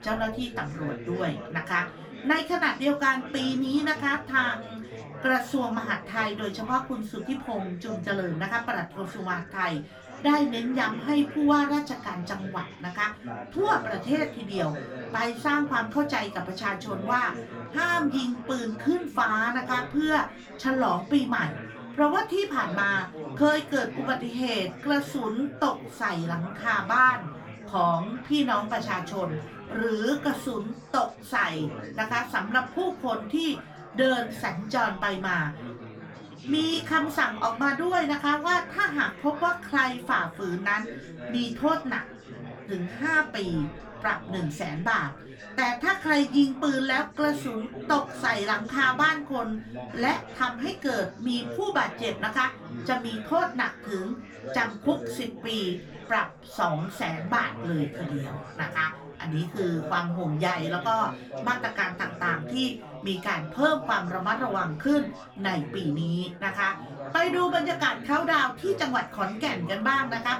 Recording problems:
off-mic speech; far
room echo; very slight; dies away in 0.2 s
chatter from many people; noticeable; throughout; 15 dB below the speech

